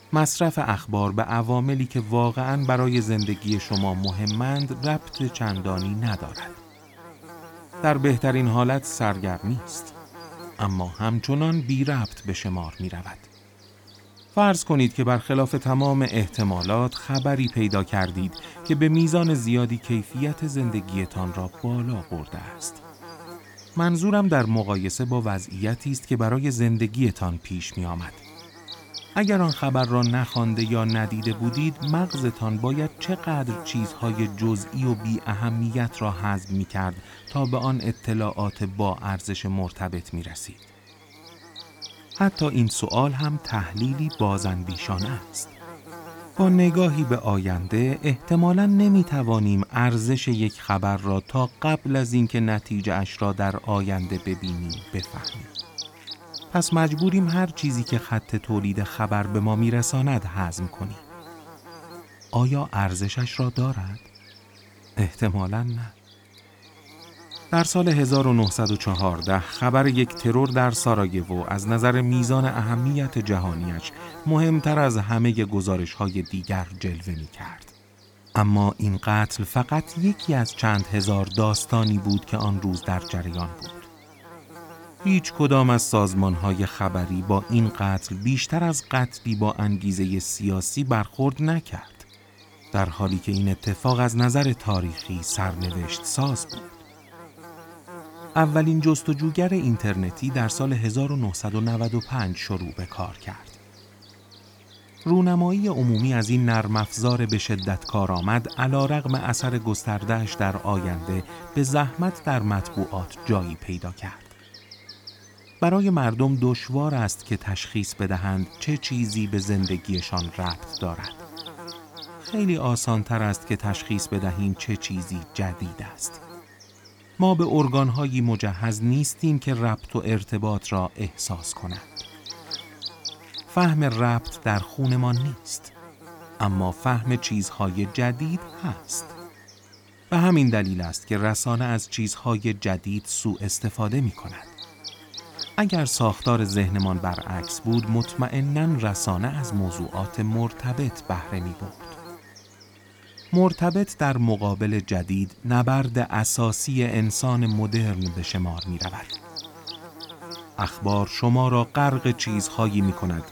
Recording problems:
electrical hum; noticeable; throughout; 50 Hz, 10 dB below the speech

